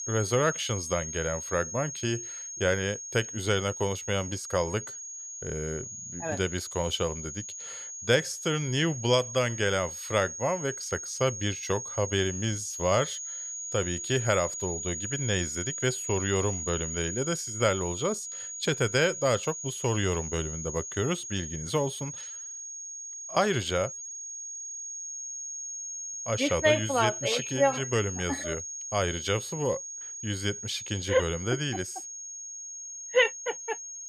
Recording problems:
high-pitched whine; loud; throughout; 6.5 kHz, 6 dB below the speech

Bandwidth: 14.5 kHz